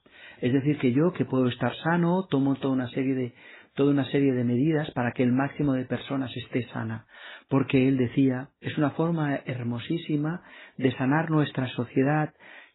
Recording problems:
garbled, watery; badly; nothing above 4 kHz

